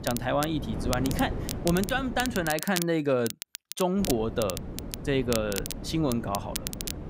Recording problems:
crackle, like an old record; loud; 8 dB below the speech
wind noise on the microphone; occasional gusts; until 2.5 s and from 4 s on; 15 dB below the speech

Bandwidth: 15.5 kHz